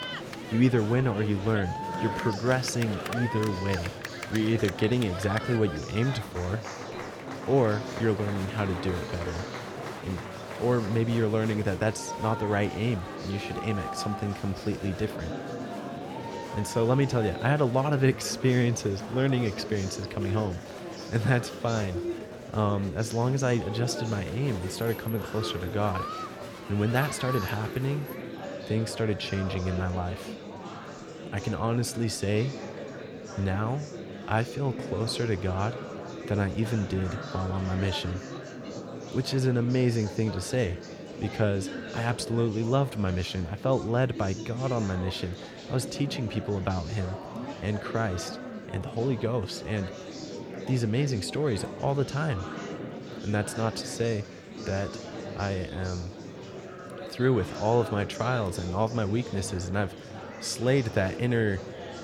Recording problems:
murmuring crowd; loud; throughout; 9 dB below the speech

